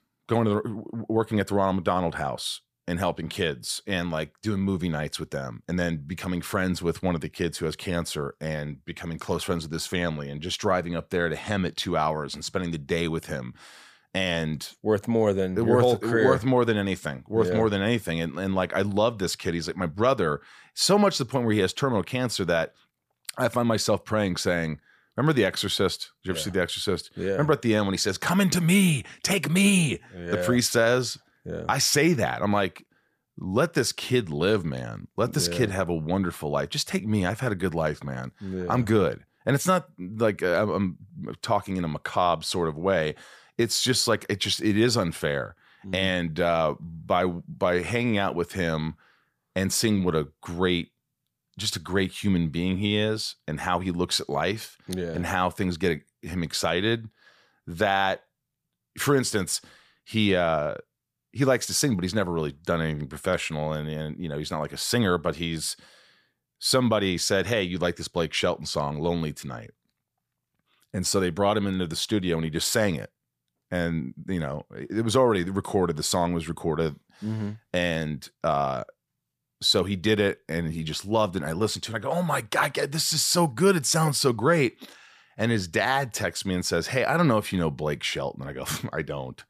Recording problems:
none

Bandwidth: 15 kHz